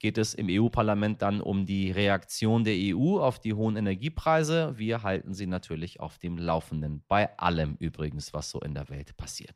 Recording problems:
none

